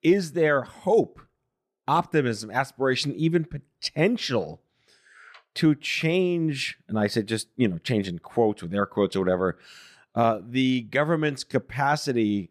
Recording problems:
none

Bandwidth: 14.5 kHz